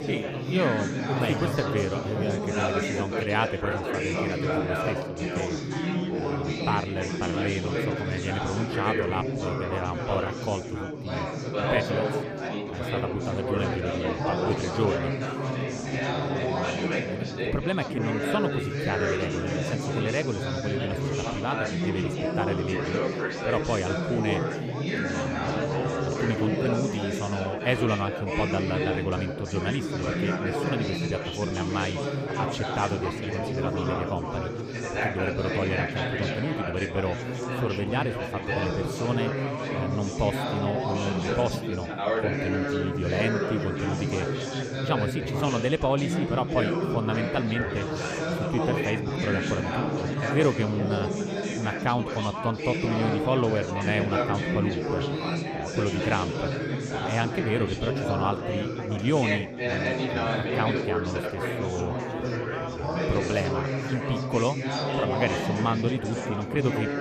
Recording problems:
chatter from many people; very loud; throughout; 1 dB above the speech

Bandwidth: 15 kHz